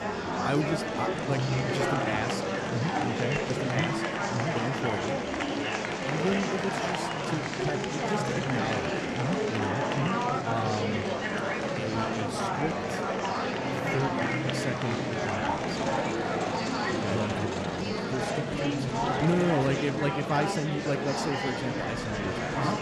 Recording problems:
murmuring crowd; very loud; throughout; 3 dB above the speech

